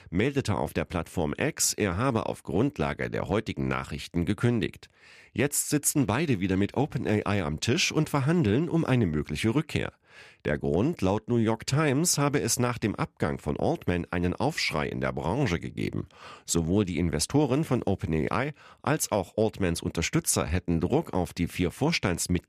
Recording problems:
none

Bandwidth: 14.5 kHz